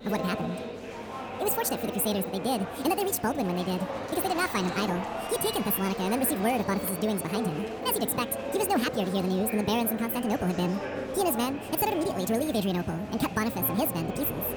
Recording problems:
wrong speed and pitch; too fast and too high; 1.7 times normal speed
murmuring crowd; loud; throughout; 7 dB below the speech

